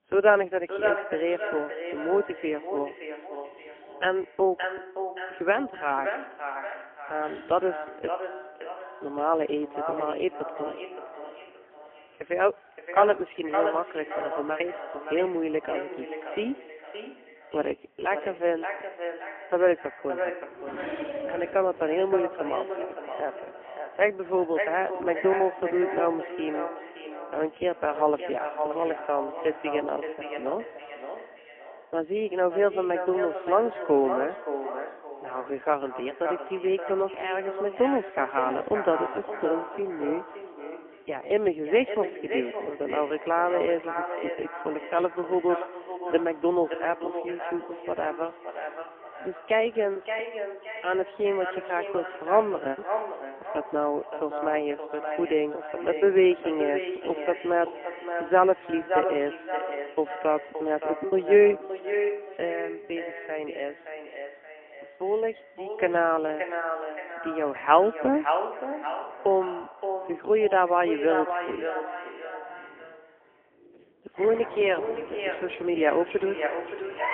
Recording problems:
phone-call audio; poor line; nothing above 3 kHz
echo of what is said; strong; throughout; 570 ms later, 7 dB below the speech
animal sounds; faint; throughout; 20 dB below the speech
traffic noise; faint; throughout; 20 dB below the speech
choppy; occasionally; 1% of the speech affected

